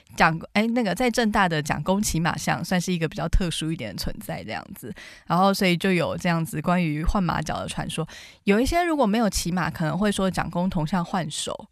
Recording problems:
none

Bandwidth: 14.5 kHz